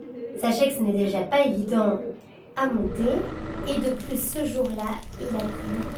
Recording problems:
off-mic speech; far
room echo; slight; dies away in 0.3 s
garbled, watery; slightly
animal sounds; noticeable; throughout; 15 dB below the speech
low rumble; noticeable; from 2.5 s on; 10 dB below the speech

